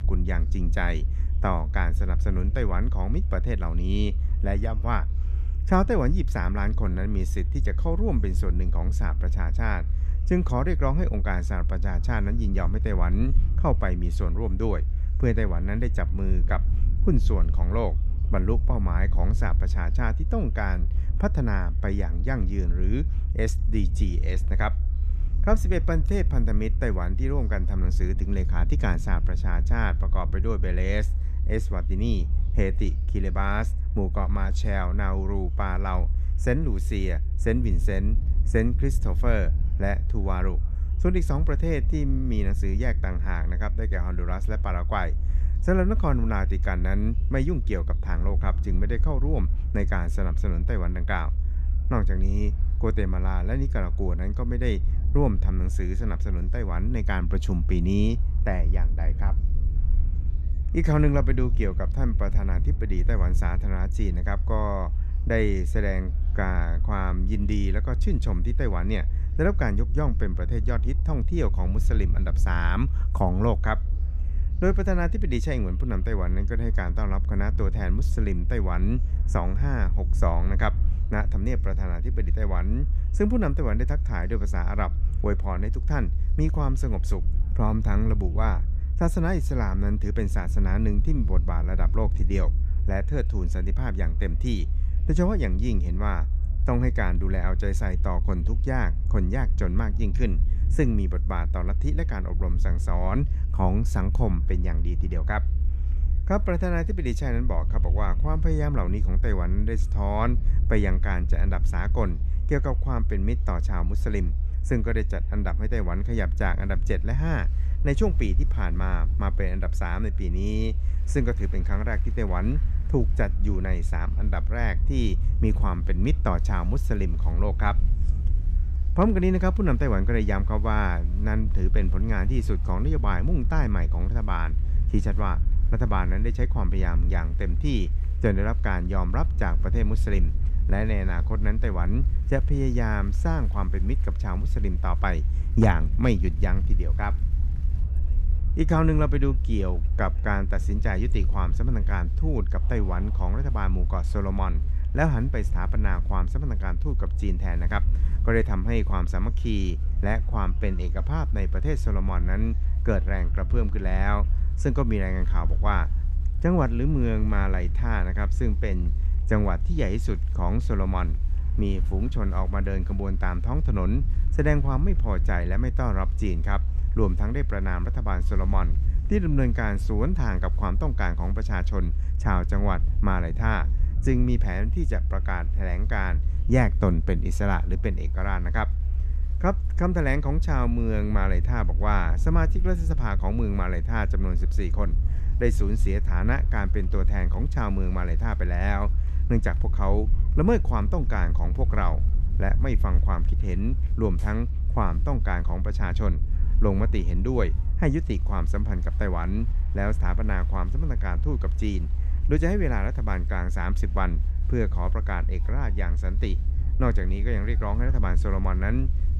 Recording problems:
low rumble; noticeable; throughout; 15 dB below the speech
chatter from many people; faint; throughout; 30 dB below the speech

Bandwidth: 14.5 kHz